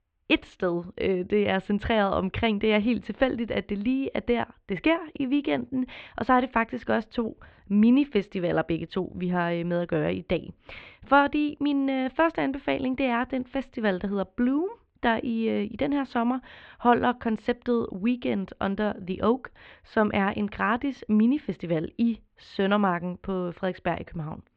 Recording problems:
muffled; very; fading above 3 kHz

